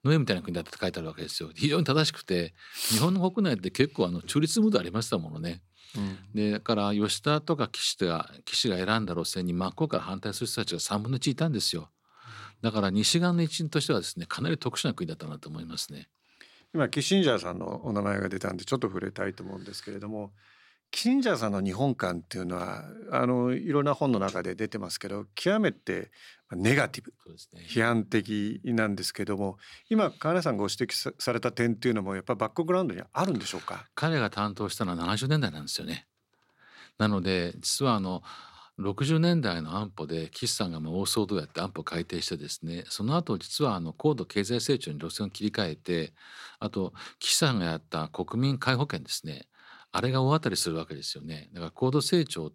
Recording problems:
none

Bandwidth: 16.5 kHz